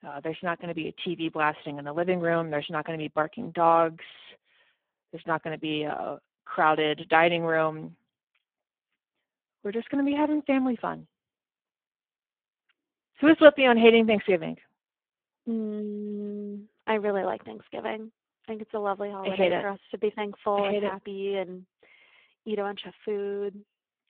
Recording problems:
phone-call audio; poor line

